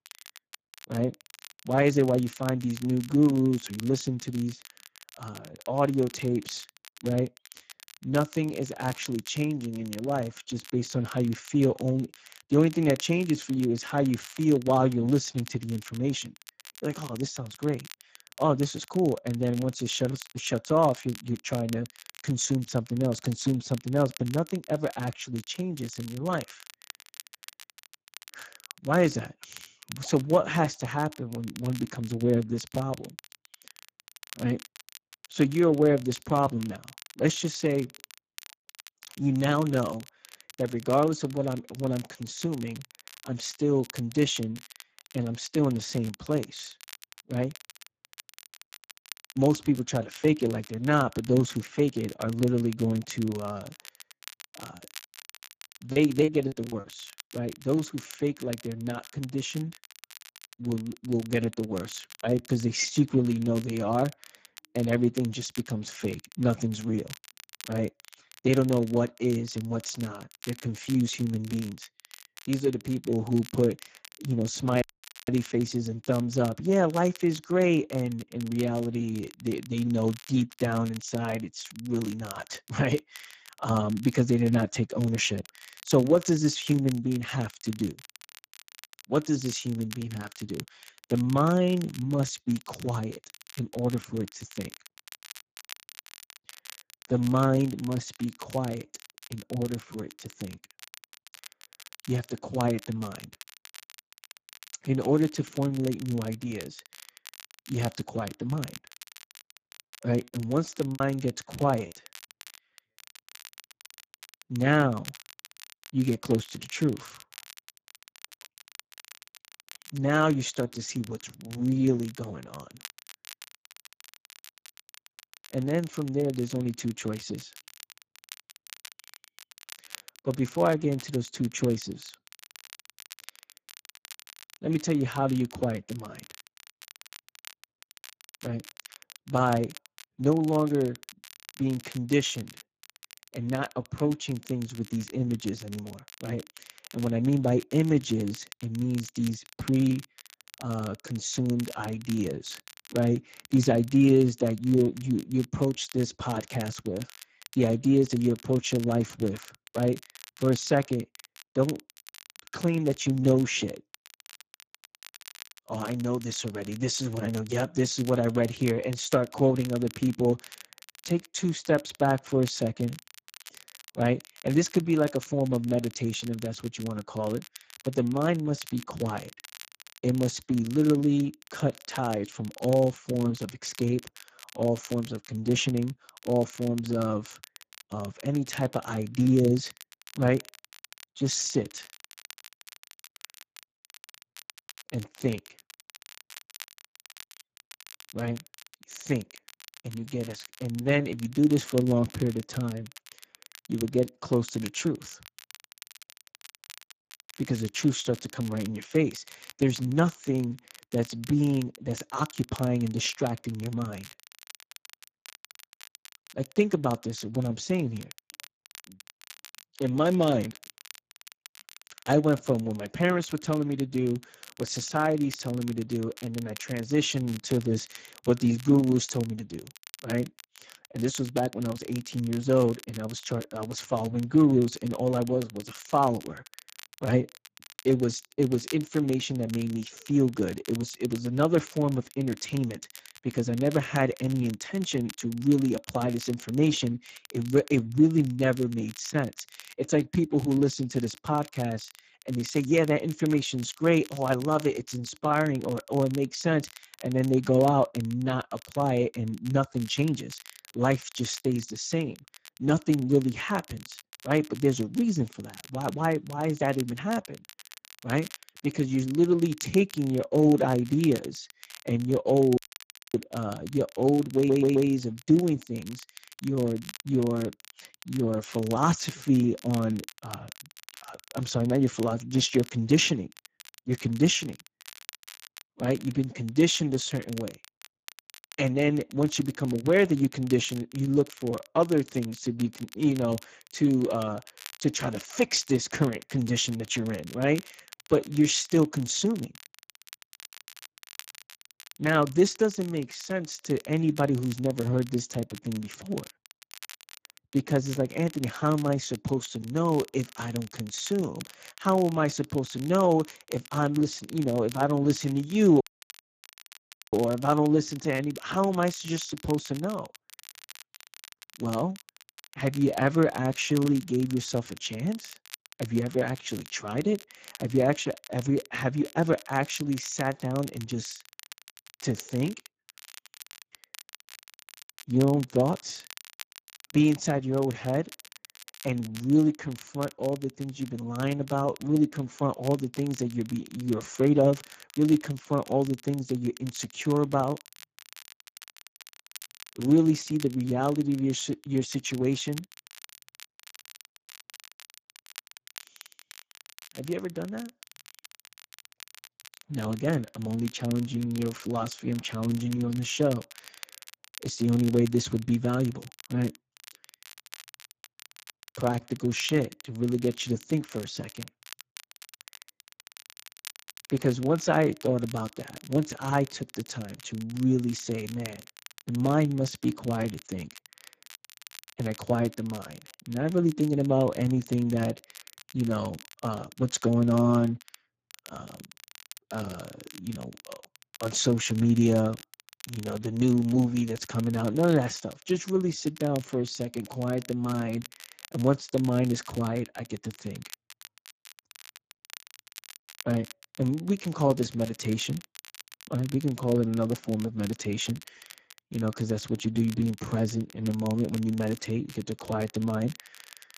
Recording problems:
garbled, watery; badly; nothing above 7.5 kHz
crackle, like an old record; noticeable; 20 dB below the speech
choppy; very; from 55 to 57 s and at 1:51; 9% of the speech affected
audio cutting out; at 1:15, at 4:33 for 0.5 s and at 5:16 for 1.5 s
audio stuttering; at 4:34

